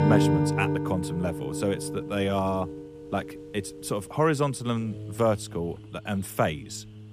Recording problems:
background music; loud; throughout; 1 dB below the speech
animal sounds; faint; throughout; 25 dB below the speech

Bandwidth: 15 kHz